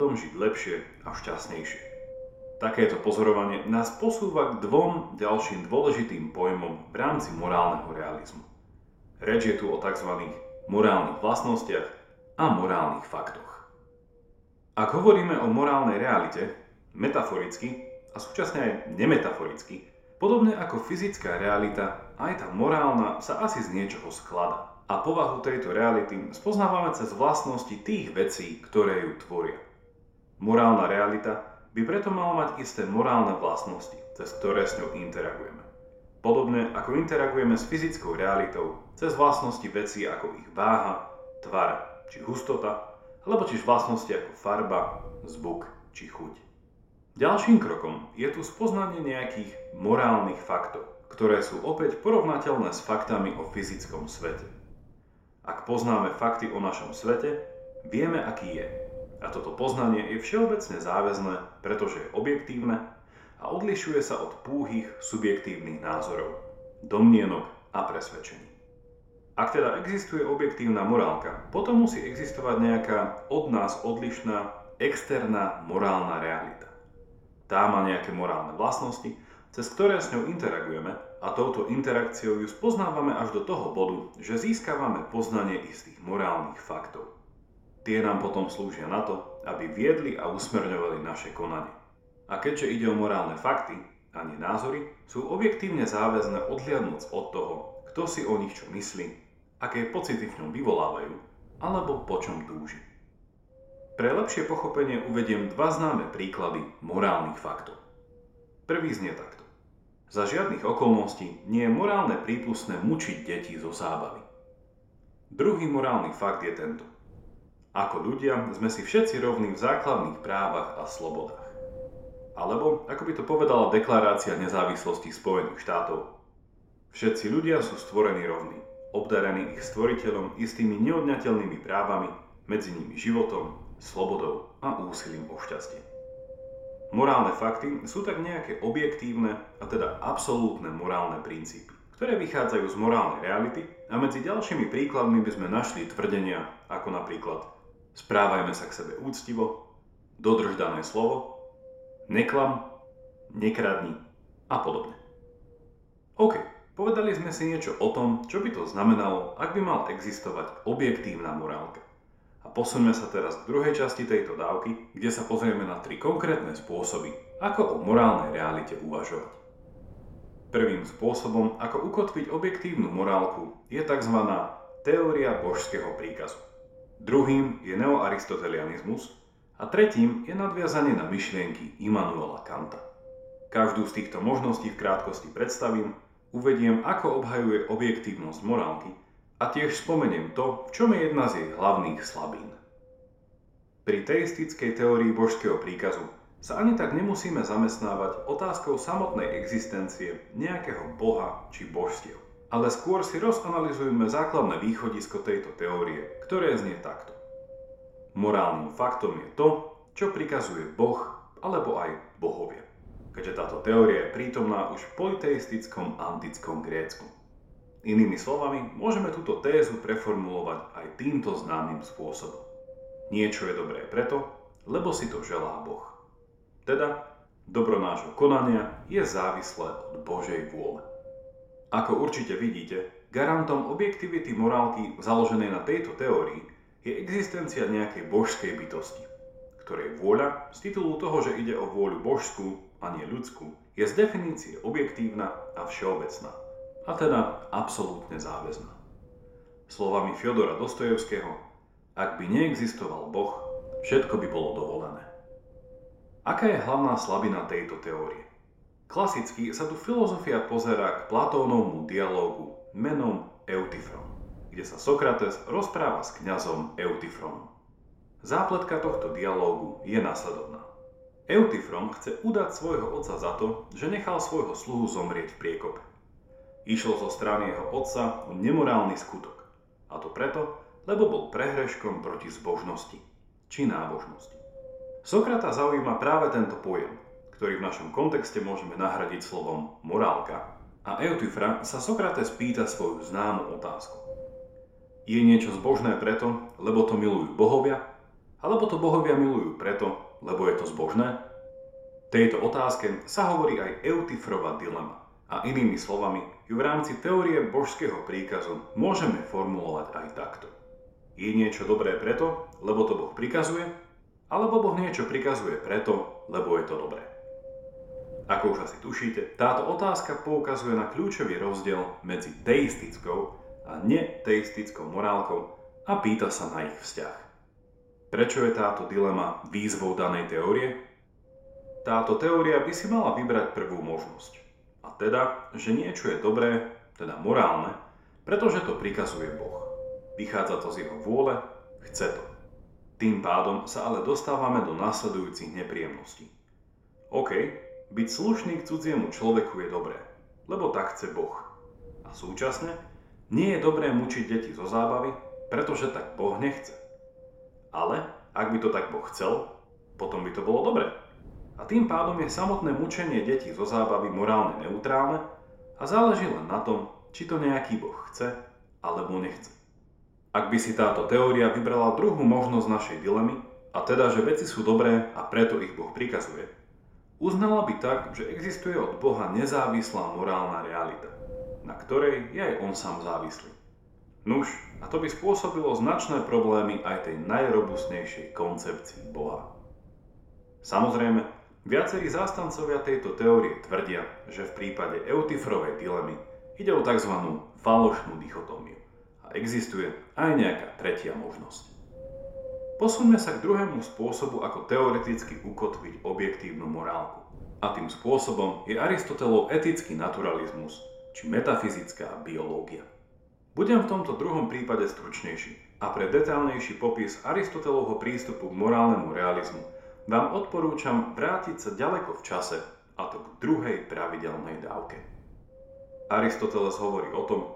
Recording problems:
room echo; slight; dies away in 0.6 s
off-mic speech; somewhat distant
wind noise on the microphone; occasional gusts; 15 dB below the speech
abrupt cut into speech; at the start

